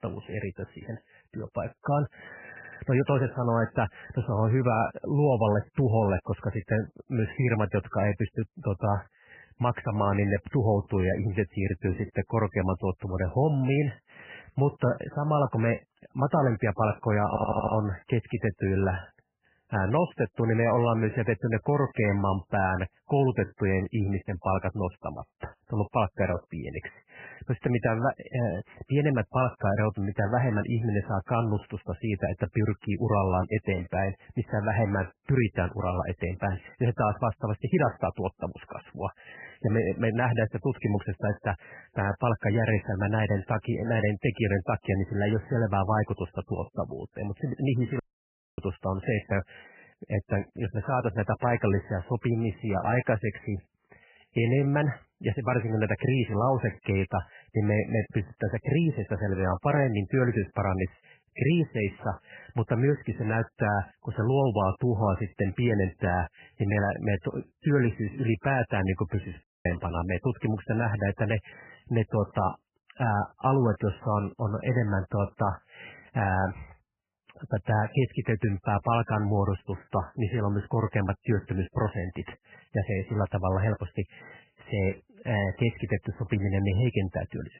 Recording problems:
garbled, watery; badly; nothing above 3 kHz
audio stuttering; at 2.5 s and at 17 s
audio cutting out; at 48 s for 0.5 s and at 1:09

